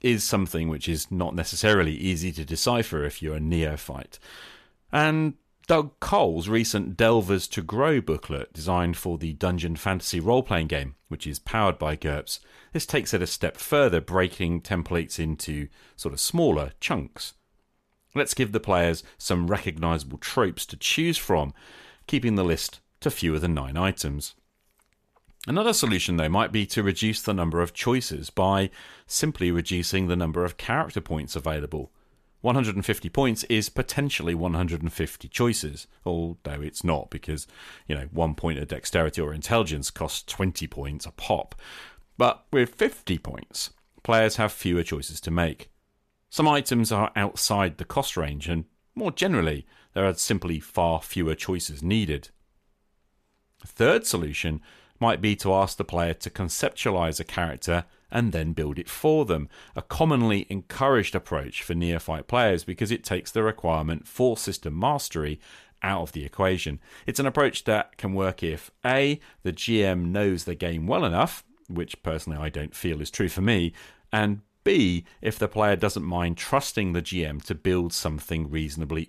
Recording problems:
none

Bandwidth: 14.5 kHz